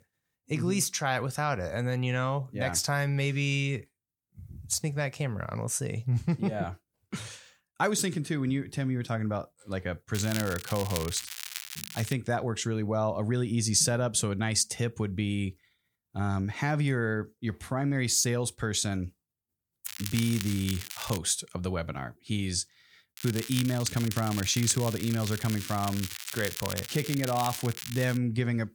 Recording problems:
crackling; loud; from 10 to 12 s, from 20 to 21 s and from 23 to 28 s; 8 dB below the speech

